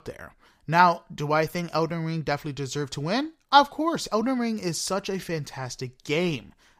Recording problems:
none

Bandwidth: 15 kHz